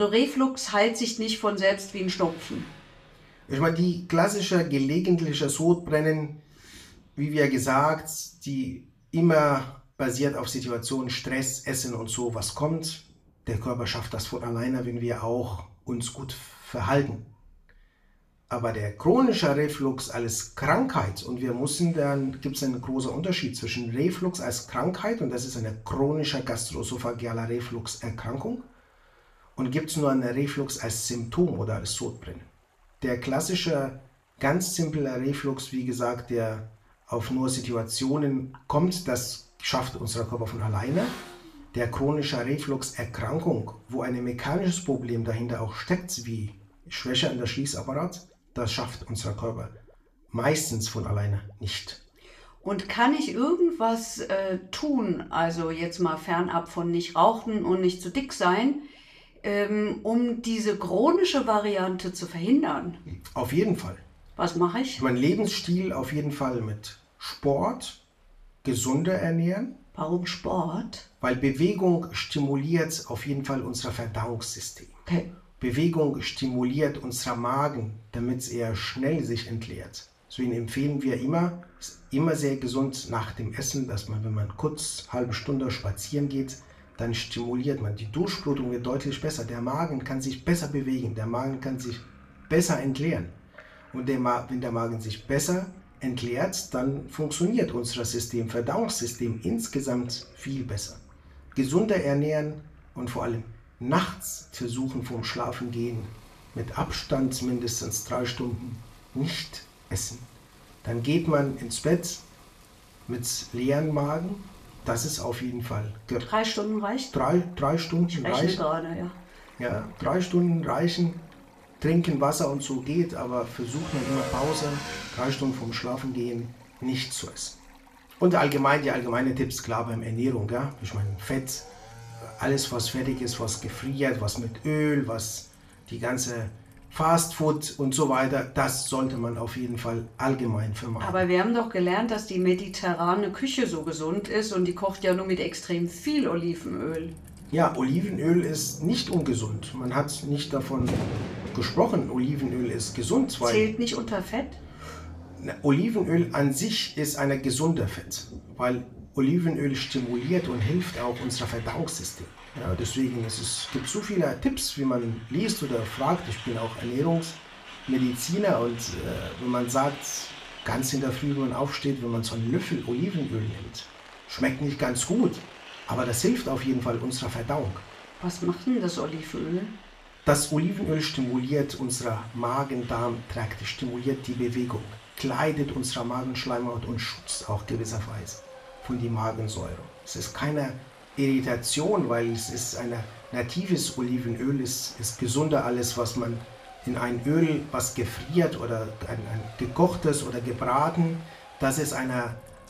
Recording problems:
room echo; slight; dies away in 0.3 s
off-mic speech; somewhat distant
traffic noise; noticeable; throughout; 20 dB below the speech
rain or running water; faint; throughout; 20 dB below the speech
abrupt cut into speech; at the start

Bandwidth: 14.5 kHz